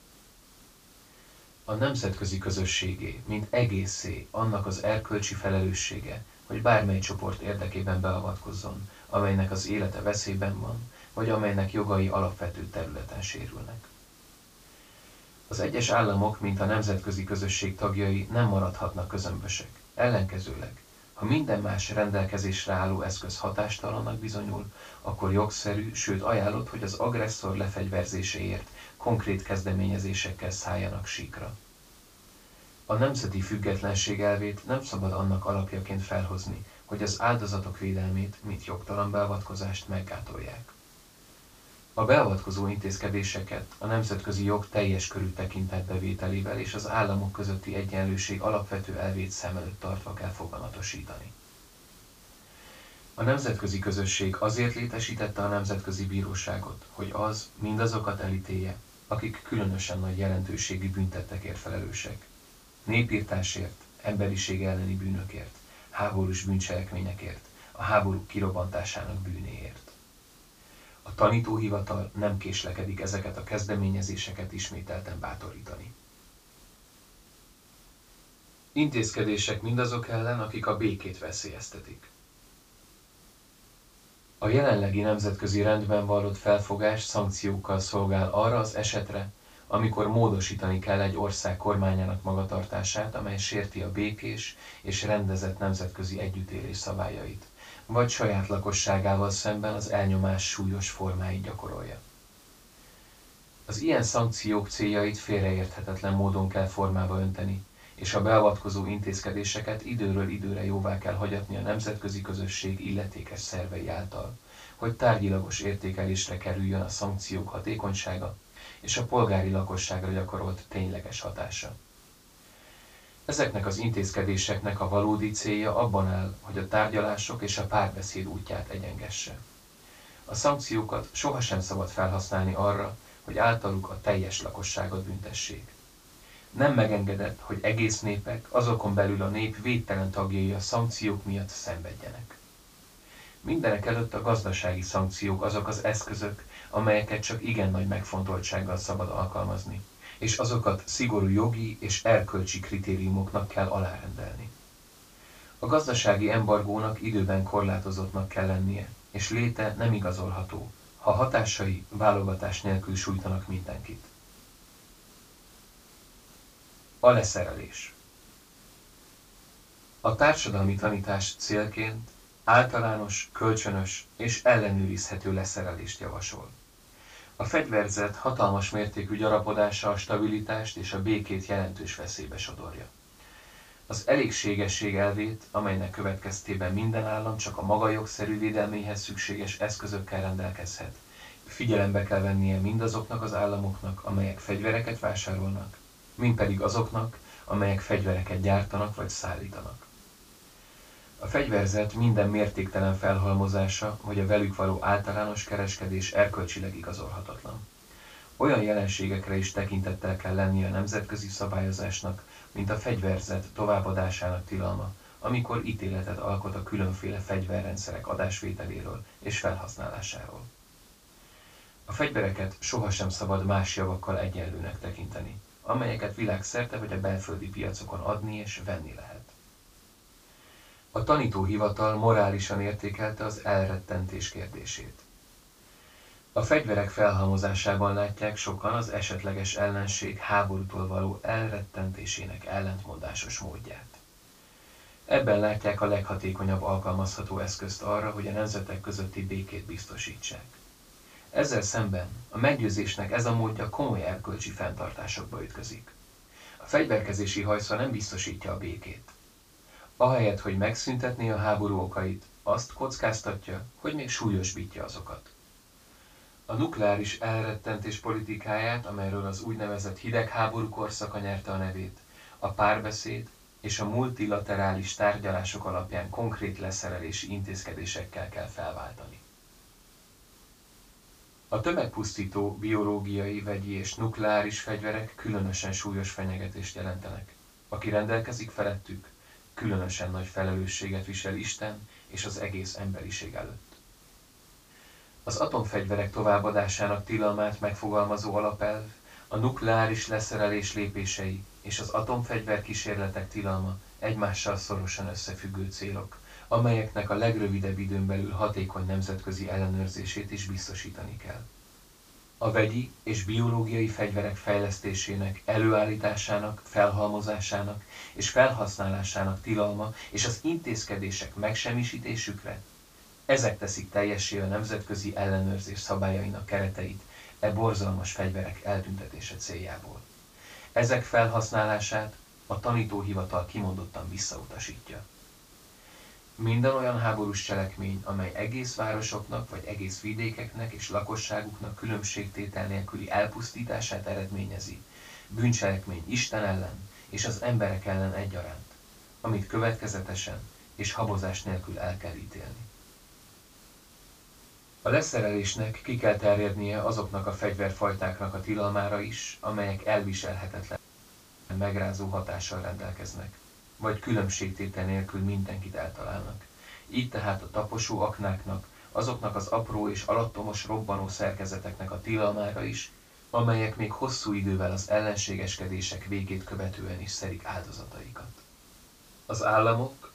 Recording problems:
off-mic speech; far
high frequencies cut off; noticeable; nothing above 8 kHz
room echo; slight; dies away in 0.2 s
hiss; faint; throughout; 25 dB below the speech
audio cutting out; at 6:01 for 0.5 s

